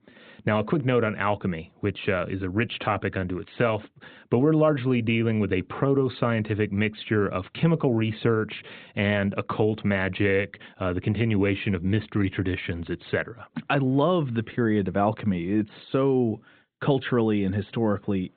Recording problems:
high frequencies cut off; severe; nothing above 4 kHz

